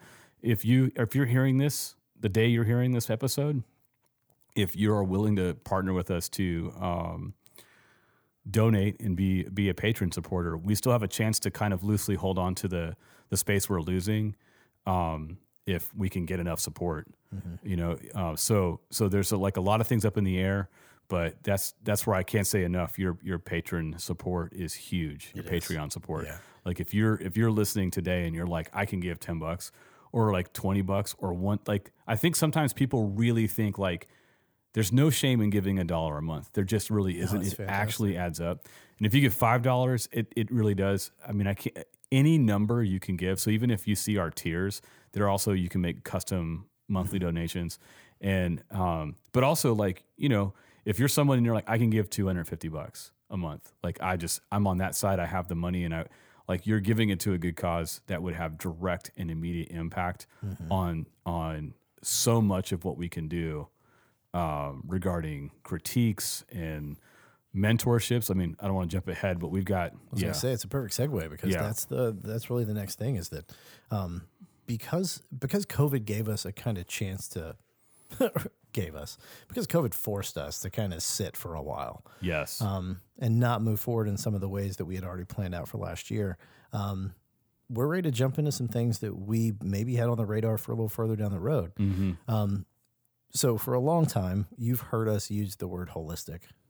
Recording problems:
none

